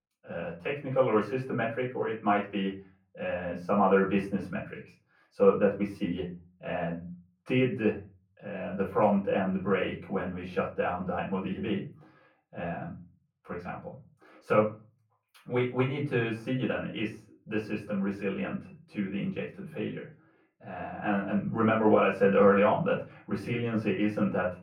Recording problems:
off-mic speech; far
muffled; very; fading above 2 kHz
room echo; slight; dies away in 0.3 s
thin; very slightly; fading below 650 Hz

